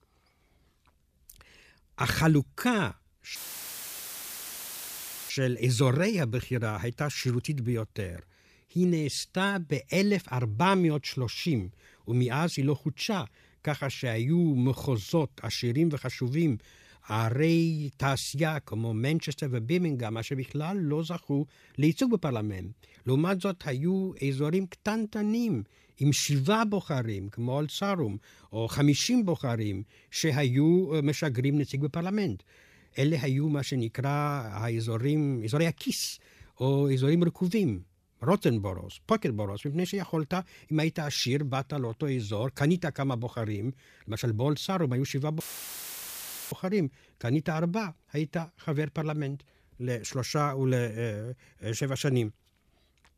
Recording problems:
audio cutting out; filled with static; at 3.5 s for 2 s and at 45 s for 1 s

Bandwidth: 15 kHz